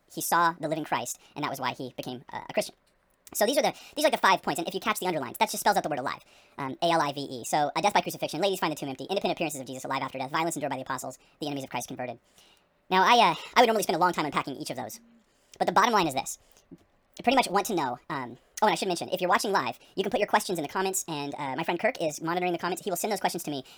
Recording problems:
wrong speed and pitch; too fast and too high; 1.6 times normal speed

